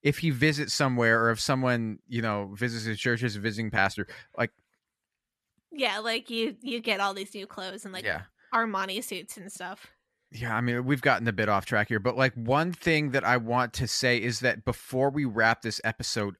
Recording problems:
none

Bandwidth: 13.5 kHz